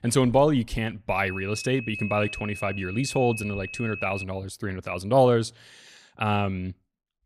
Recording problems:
high-pitched whine; loud; from 1 to 4 s; 2.5 kHz, 10 dB below the speech

